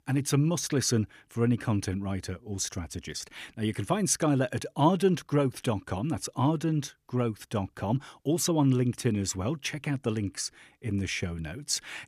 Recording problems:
none

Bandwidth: 14.5 kHz